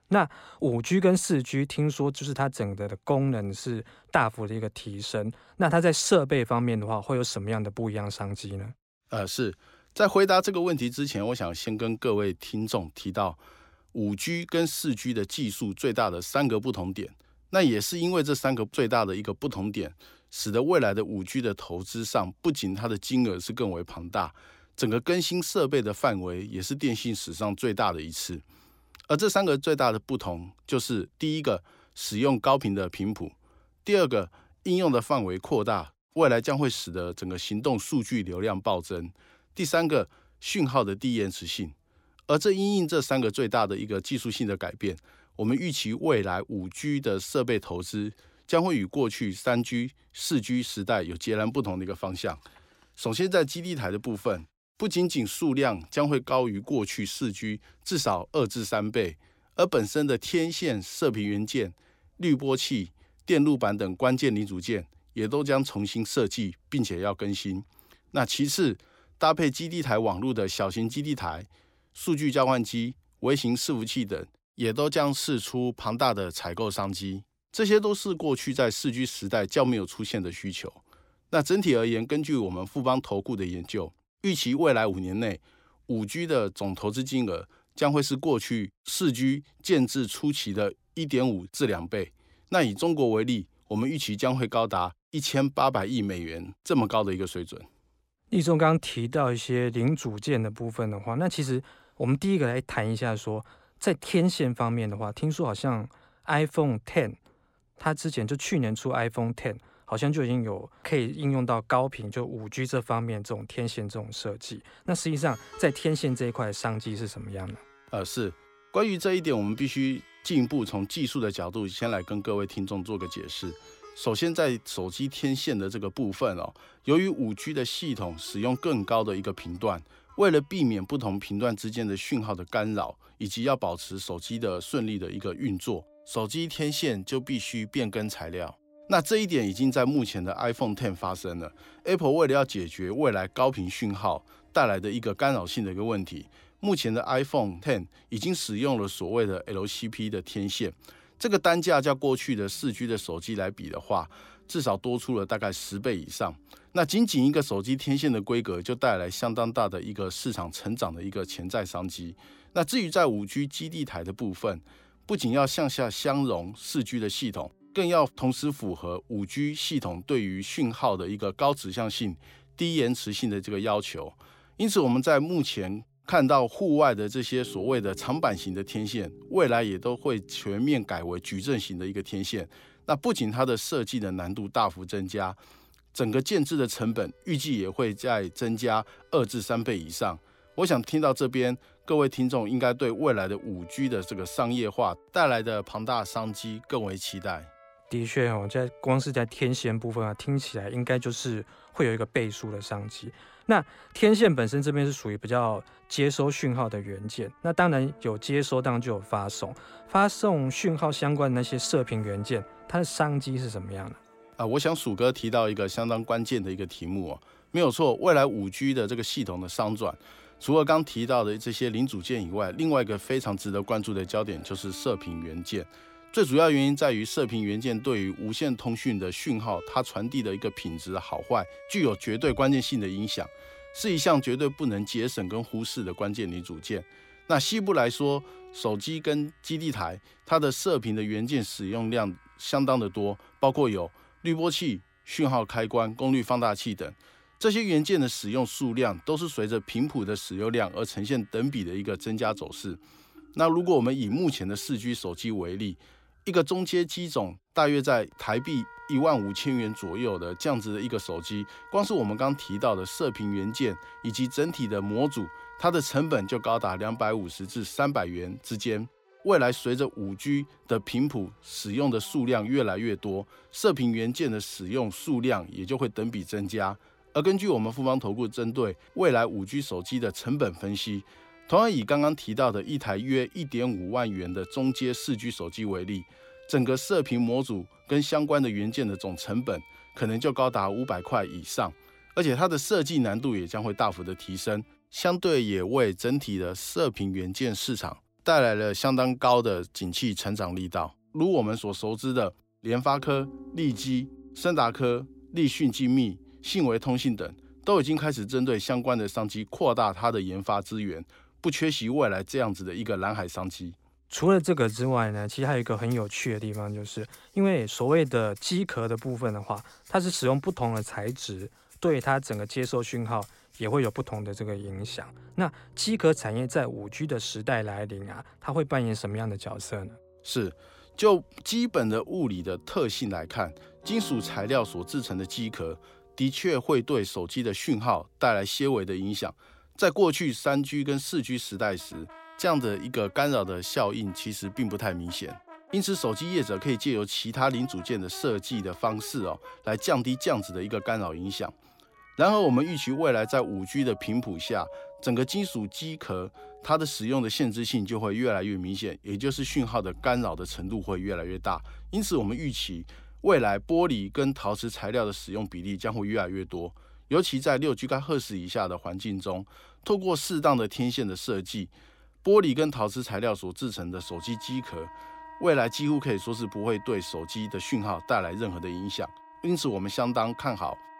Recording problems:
background music; faint; from 1:55 on; 25 dB below the speech

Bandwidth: 16.5 kHz